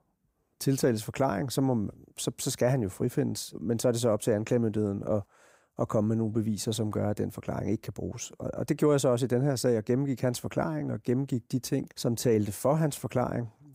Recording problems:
none

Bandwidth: 15.5 kHz